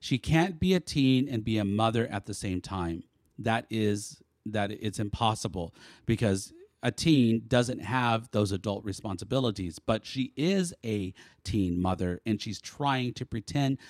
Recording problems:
none

